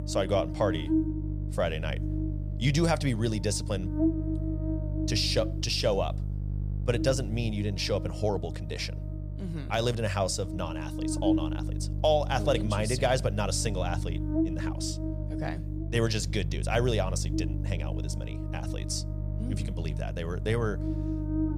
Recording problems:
electrical hum; loud; throughout; 50 Hz, 9 dB below the speech

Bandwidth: 14.5 kHz